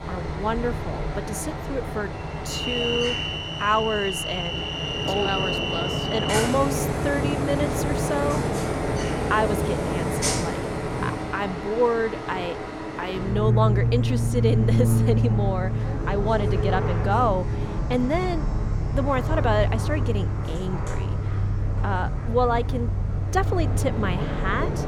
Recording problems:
train or aircraft noise; very loud; throughout; 2 dB above the speech

